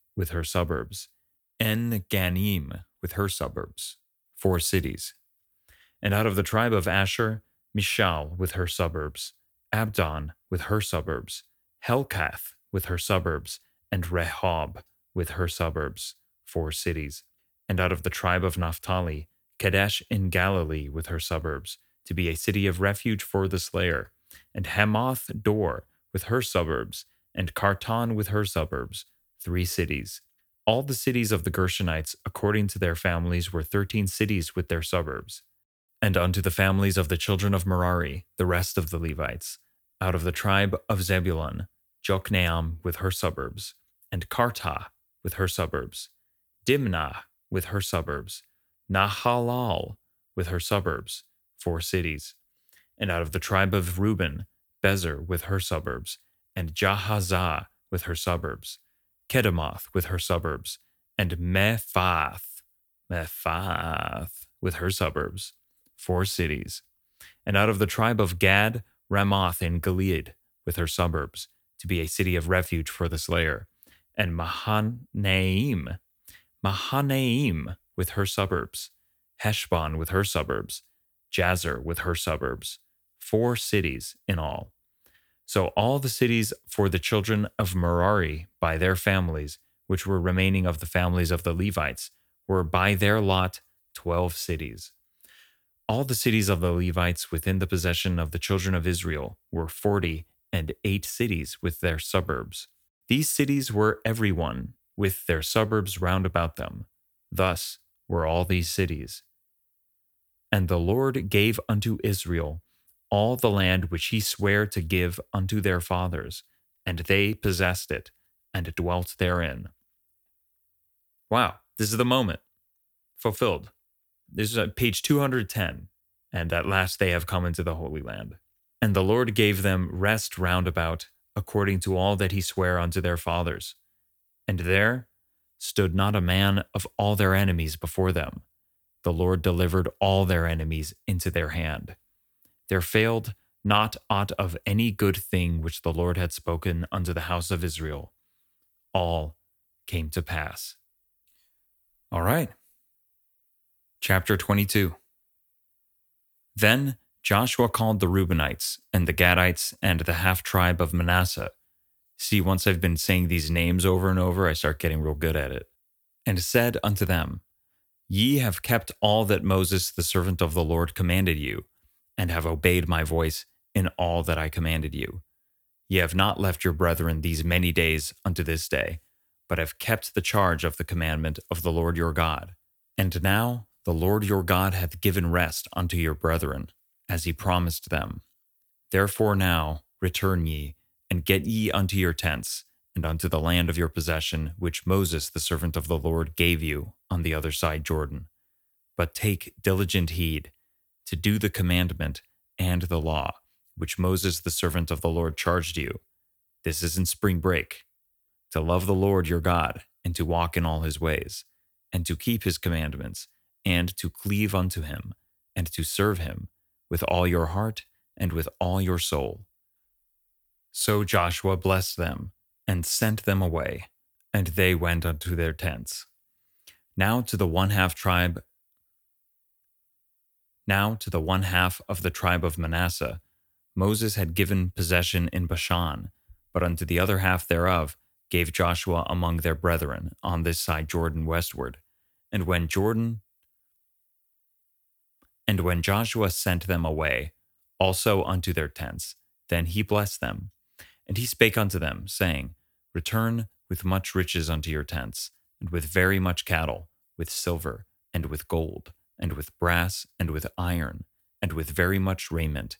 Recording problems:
none

